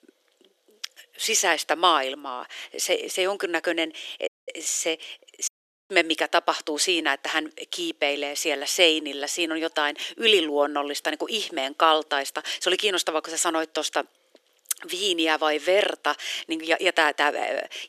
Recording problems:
thin; very; fading below 400 Hz
audio cutting out; at 4.5 s and at 5.5 s

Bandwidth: 14 kHz